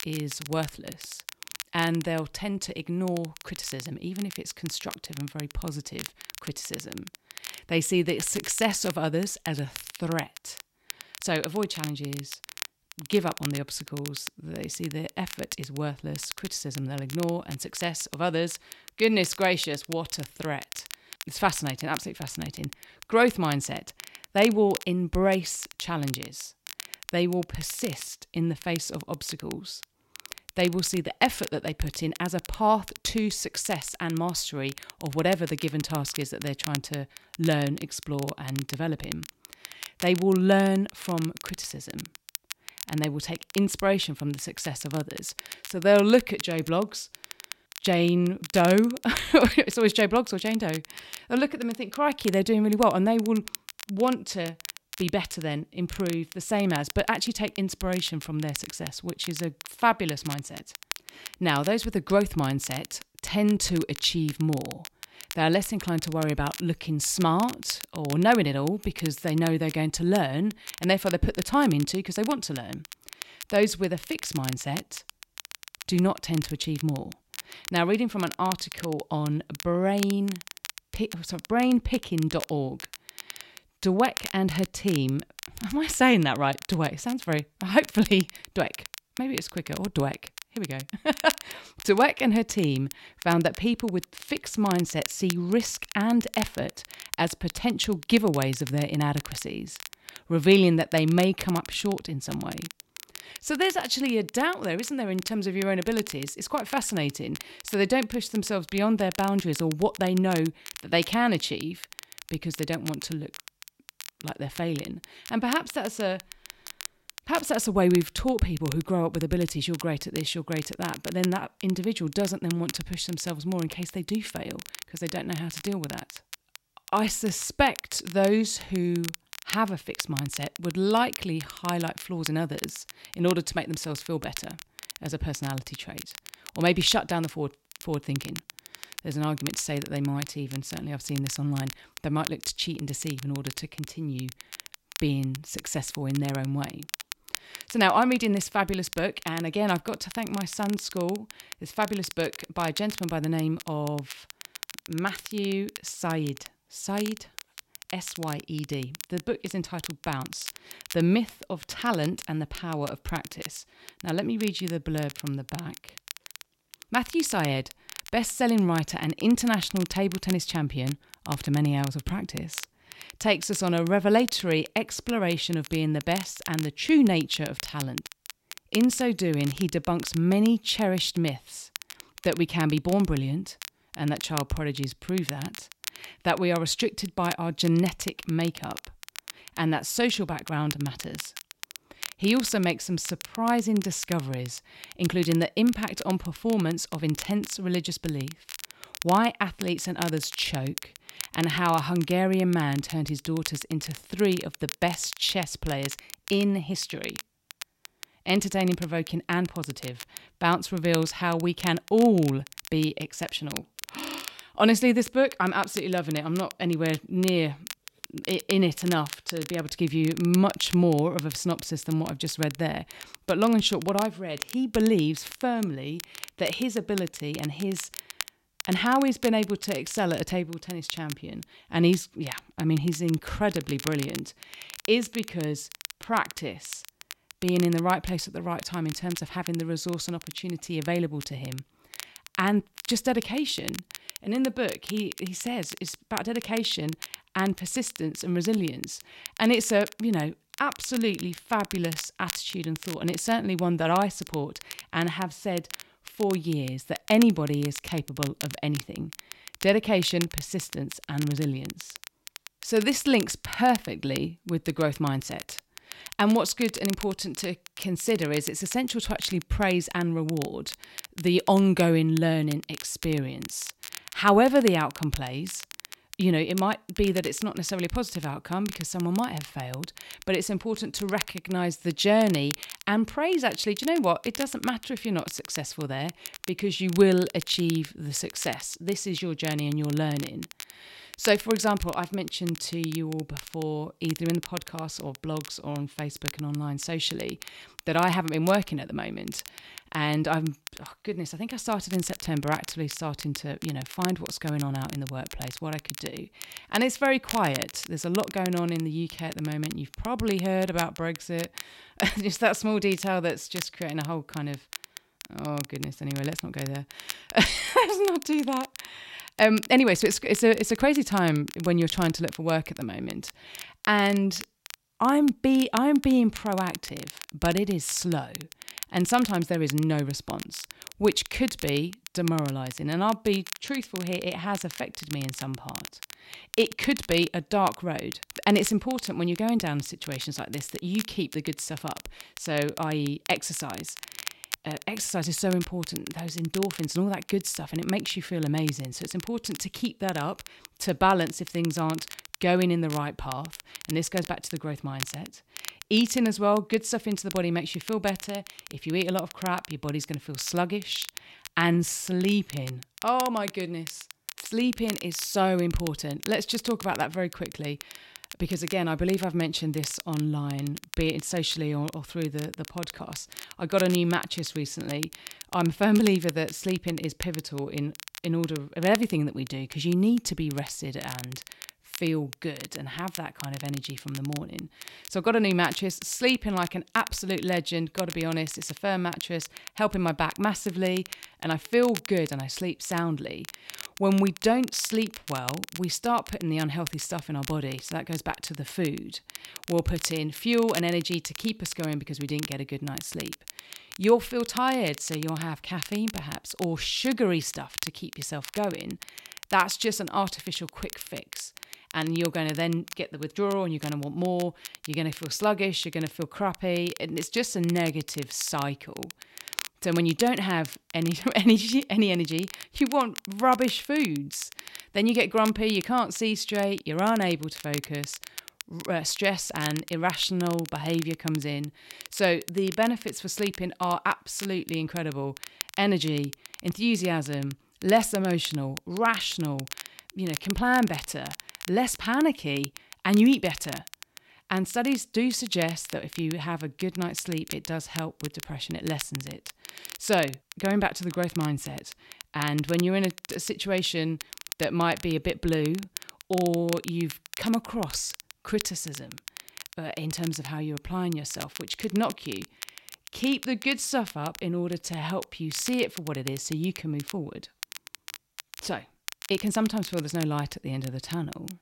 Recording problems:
crackle, like an old record; noticeable; 15 dB below the speech

